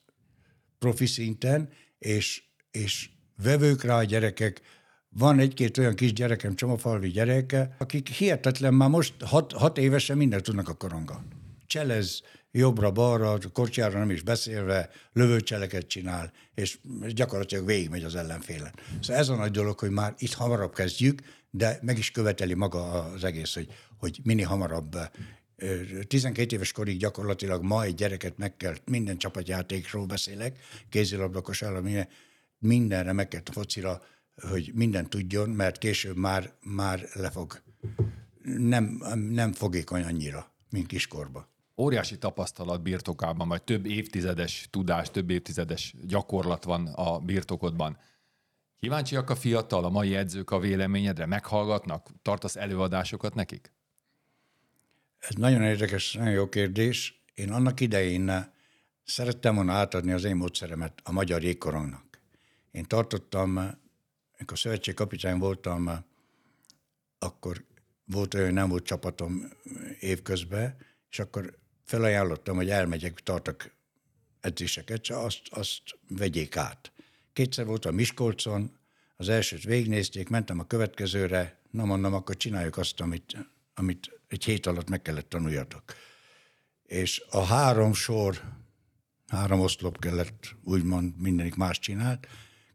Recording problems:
none

